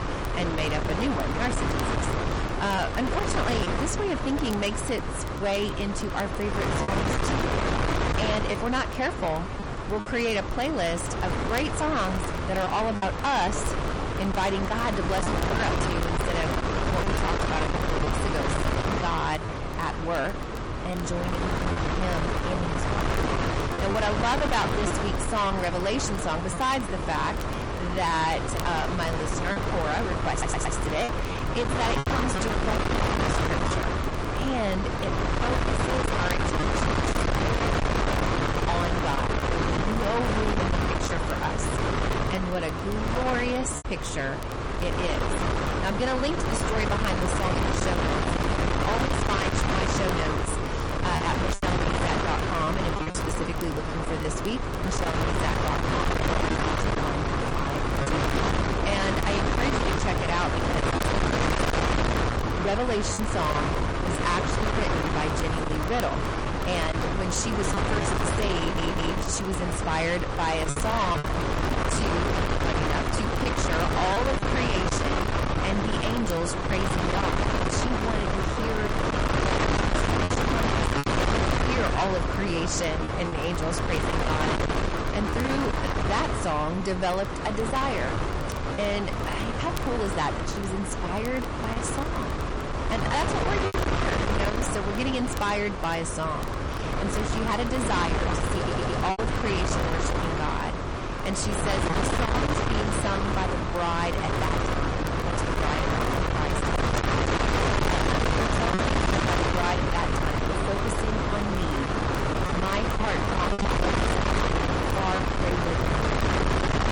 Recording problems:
distortion; heavy; 7 dB below the speech
garbled, watery; slightly; nothing above 10.5 kHz
wind noise on the microphone; heavy; 1 dB above the speech
crackle, like an old record; faint; 20 dB below the speech
choppy; occasionally; 2% of the speech affected
audio stuttering; at 30 s, at 1:09 and at 1:39

